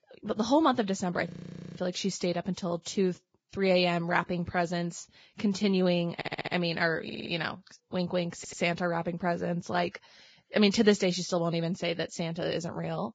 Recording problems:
garbled, watery; badly; nothing above 7.5 kHz
audio freezing; at 1.5 s
audio stuttering; at 6 s, at 7 s and at 8.5 s

